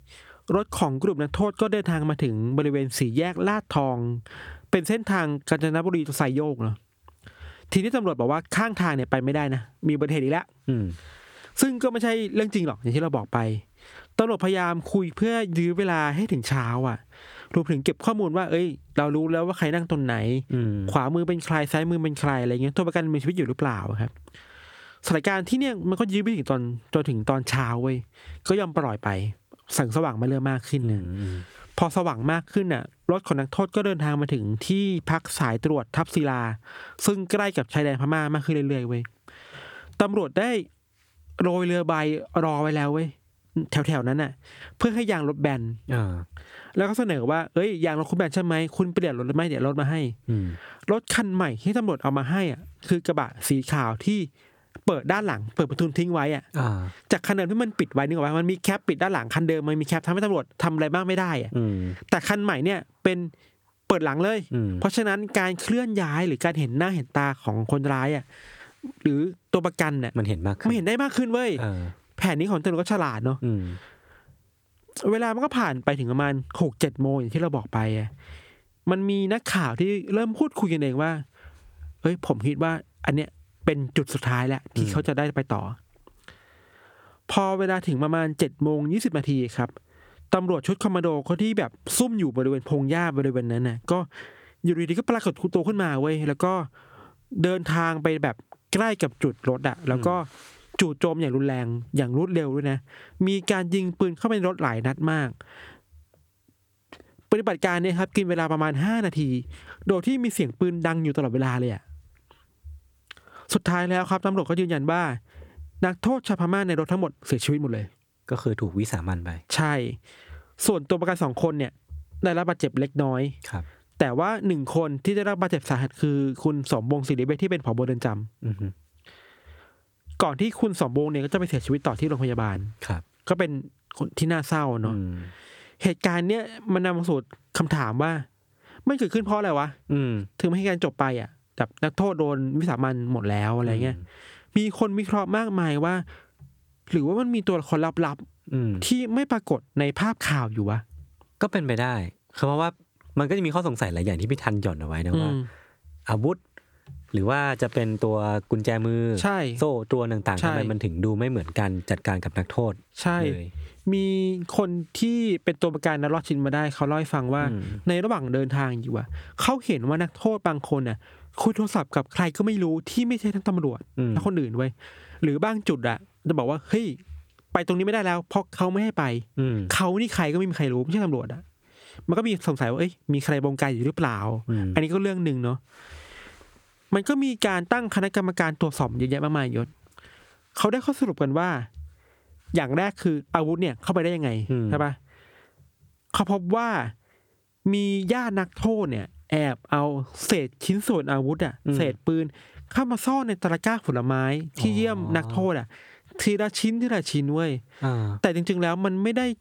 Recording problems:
squashed, flat; somewhat

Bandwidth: 18.5 kHz